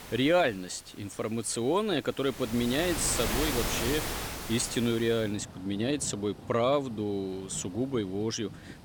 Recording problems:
rain or running water; loud; throughout; 6 dB below the speech

